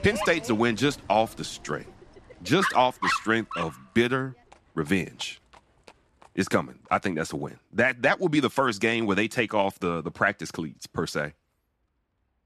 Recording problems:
animal sounds; loud; throughout; 6 dB below the speech

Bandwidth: 13.5 kHz